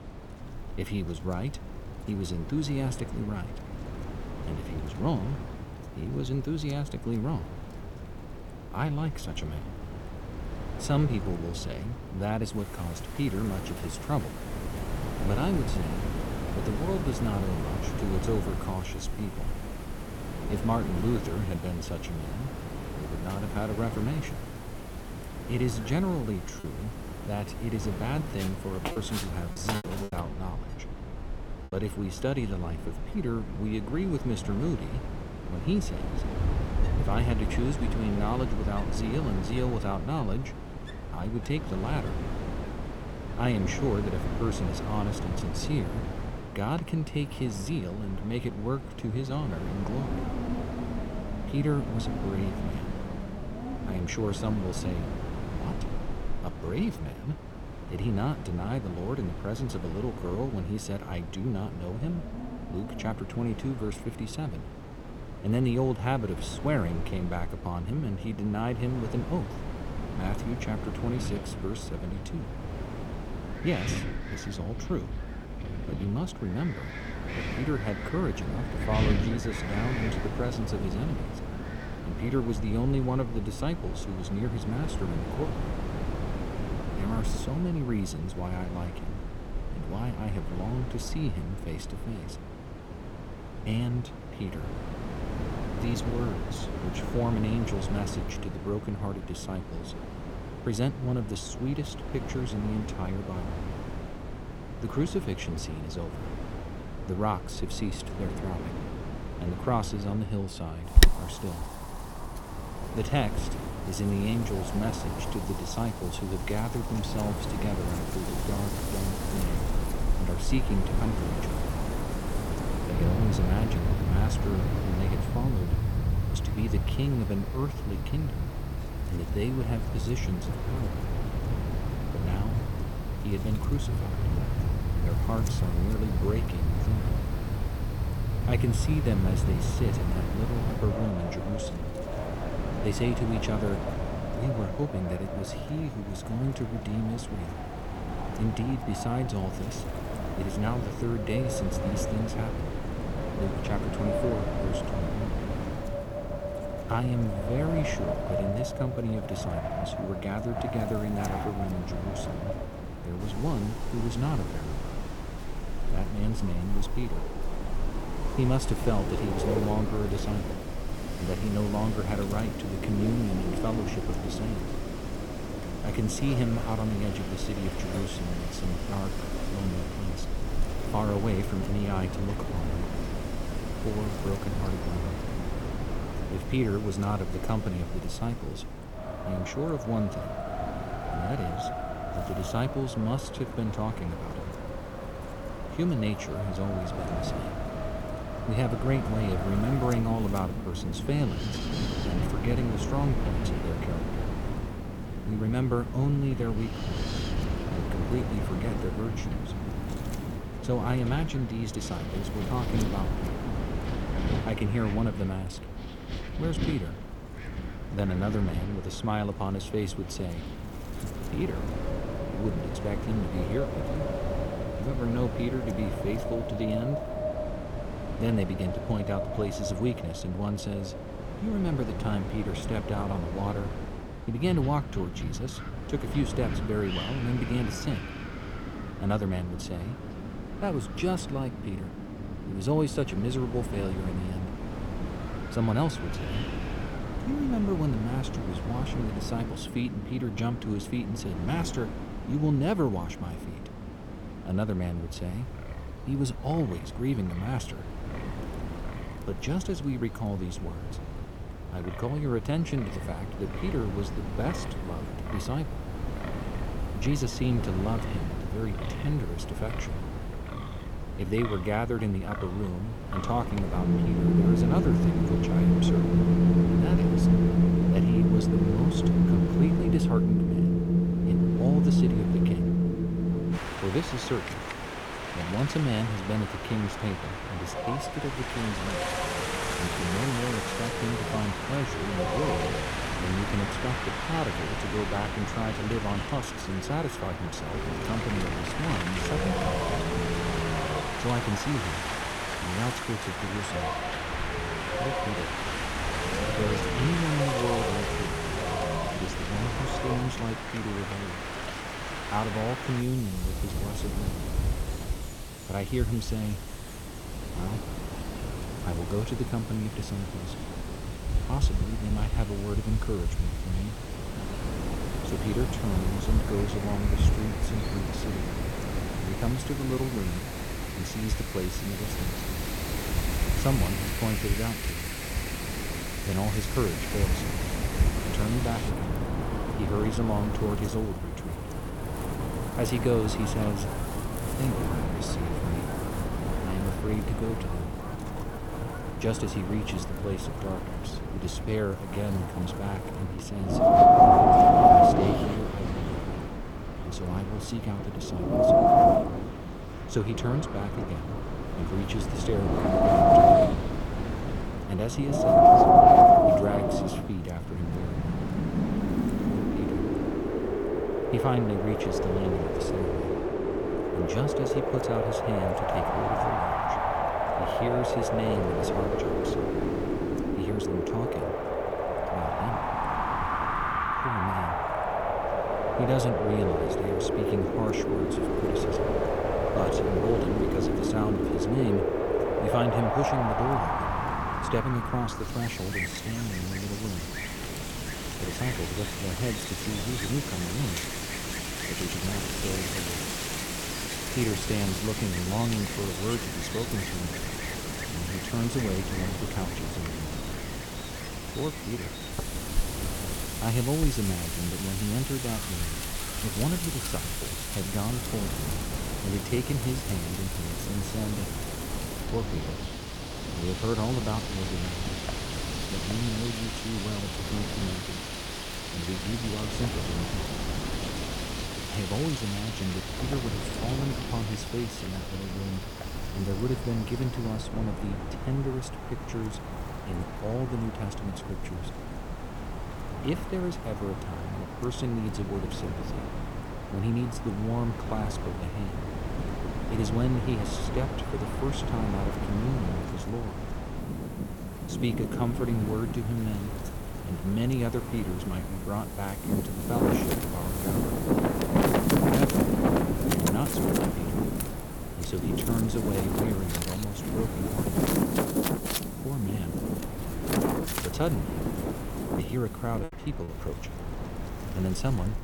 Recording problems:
wind in the background; very loud; throughout; 2 dB above the speech
wind noise on the microphone; occasional gusts; from 1:56 to 3:47 and from 5:27 on; 20 dB below the speech
choppy; very; at 27 s, from 29 to 32 s and at 7:53; 8% of the speech affected

